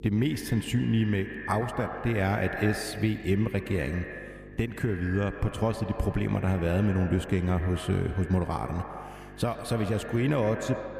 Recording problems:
echo of what is said; strong; throughout; 110 ms later, 10 dB below the speech
electrical hum; faint; throughout; 50 Hz, 20 dB below the speech

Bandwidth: 15 kHz